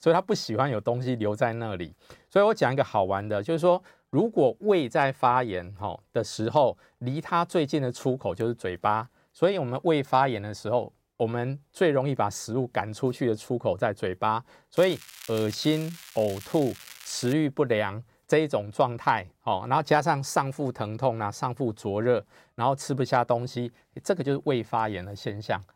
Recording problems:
crackling; noticeable; from 15 to 17 s; 15 dB below the speech

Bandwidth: 16 kHz